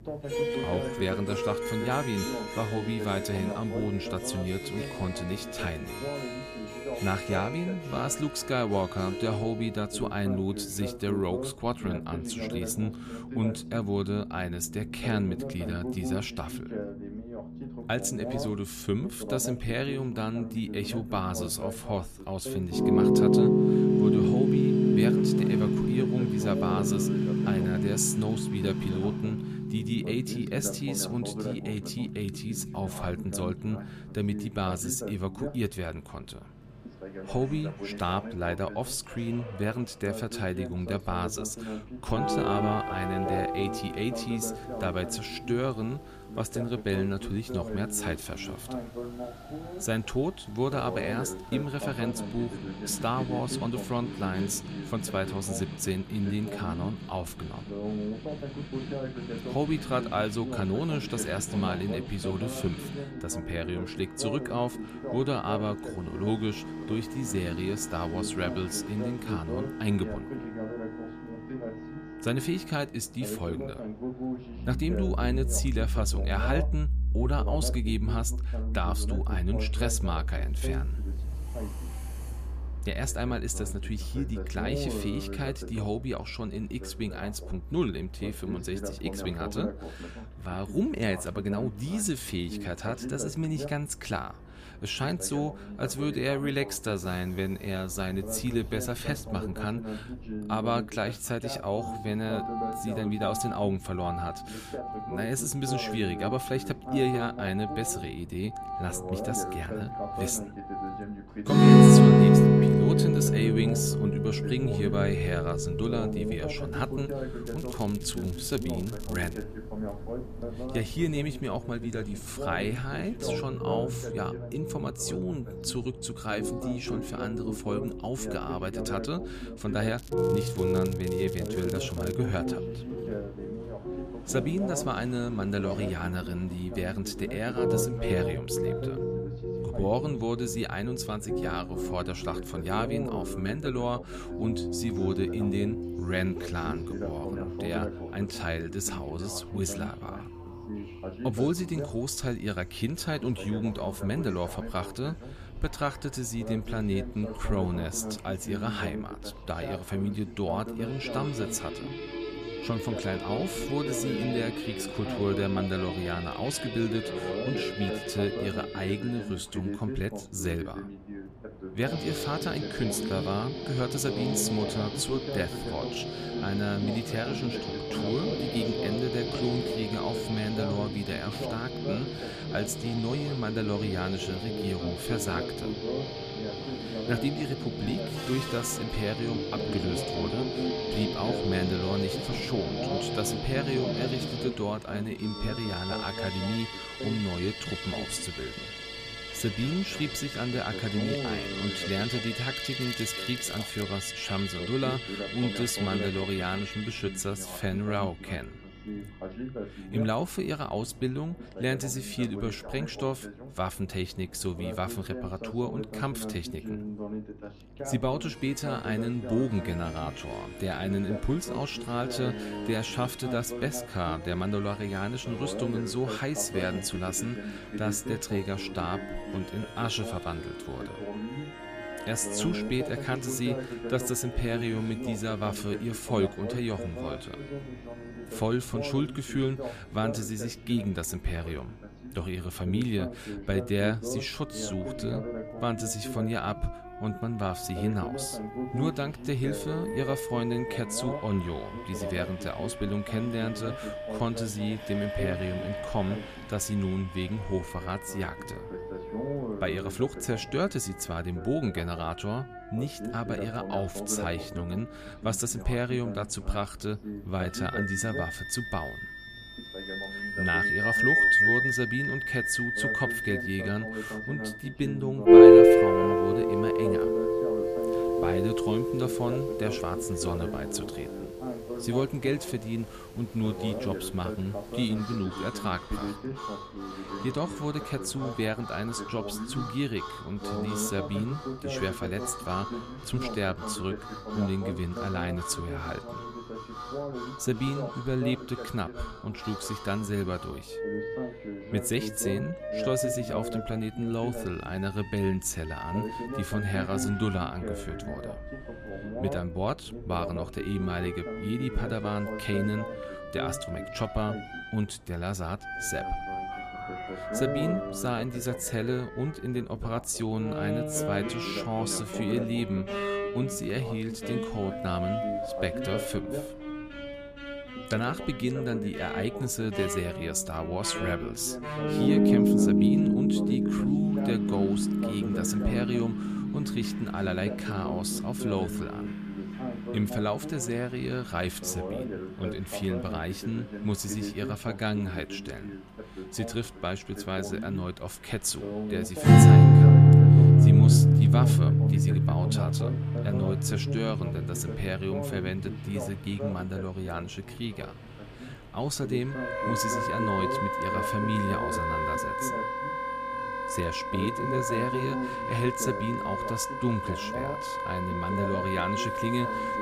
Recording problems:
background music; very loud; throughout; 4 dB above the speech
voice in the background; loud; throughout; 7 dB below the speech
train or aircraft noise; noticeable; throughout; 20 dB below the speech
crackling; noticeable; from 1:57 to 1:59, from 2:10 to 2:12 and from 3:23 to 3:24; 15 dB below the speech
electrical hum; faint; throughout; 50 Hz, 25 dB below the speech

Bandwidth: 14.5 kHz